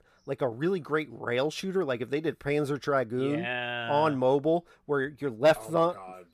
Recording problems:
none

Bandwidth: 14.5 kHz